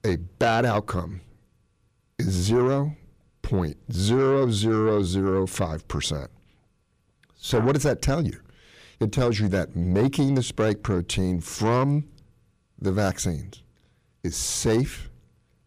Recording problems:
distortion; slight; 10 dB below the speech

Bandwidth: 15 kHz